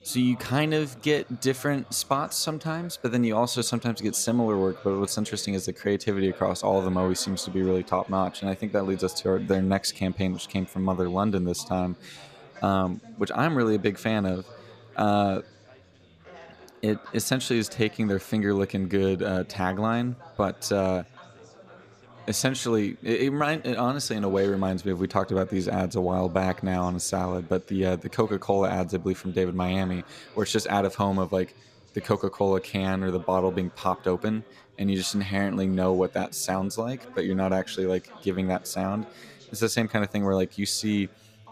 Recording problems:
background chatter; faint; throughout; 4 voices, 20 dB below the speech

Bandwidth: 14.5 kHz